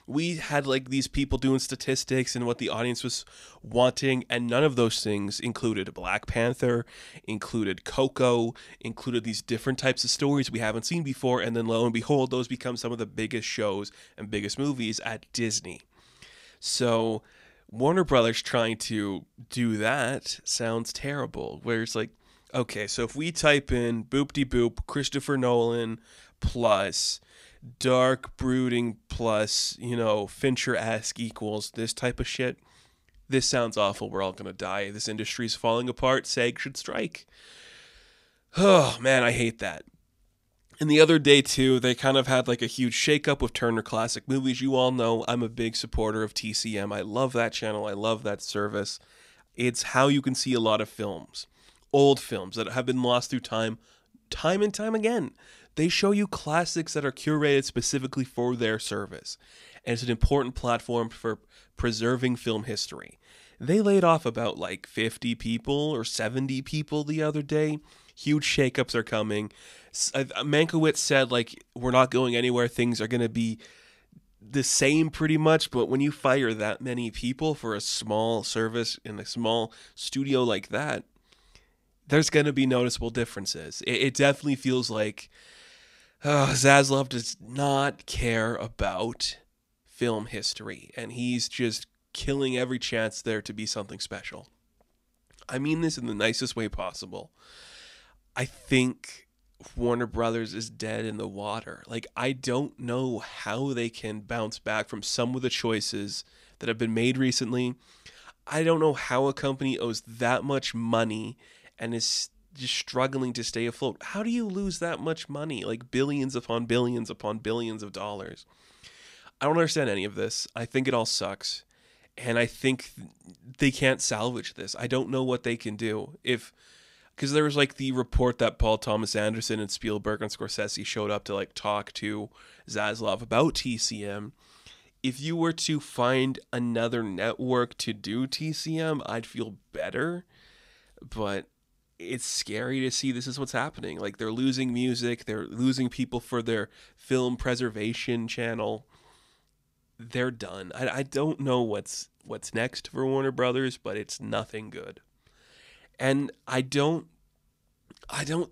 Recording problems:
uneven, jittery; strongly; from 28 s to 2:02

